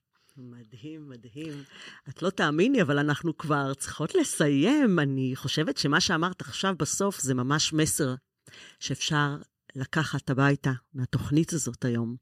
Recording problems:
none

